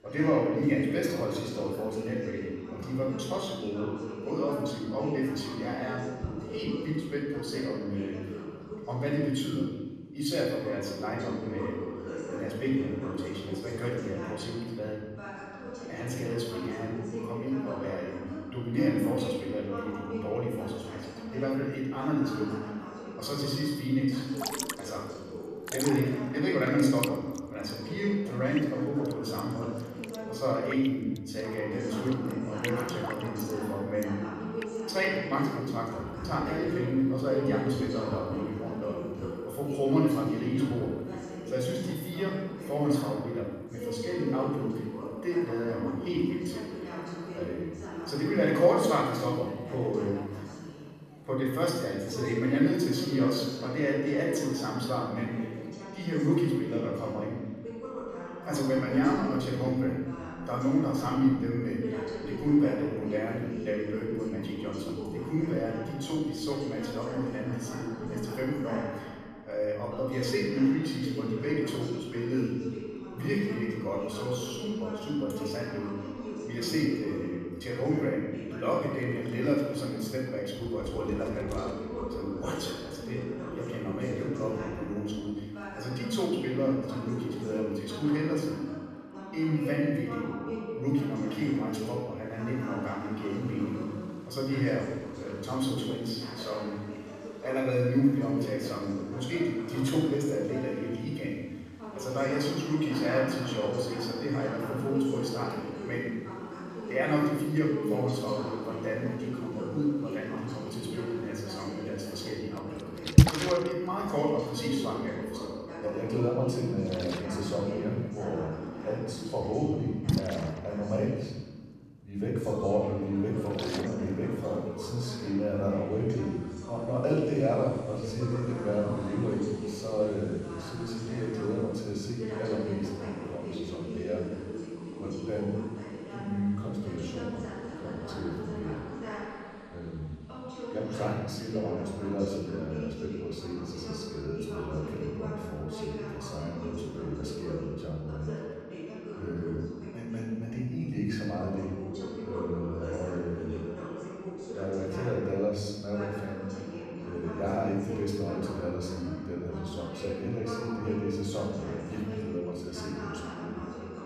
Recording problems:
off-mic speech; far
room echo; noticeable; dies away in 1 s
rain or running water; loud; throughout; 6 dB below the speech
voice in the background; loud; throughout; 8 dB below the speech

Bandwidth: 14 kHz